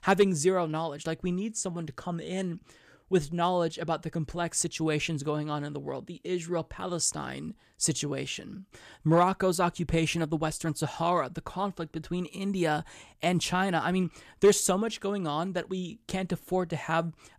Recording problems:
none

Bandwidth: 14.5 kHz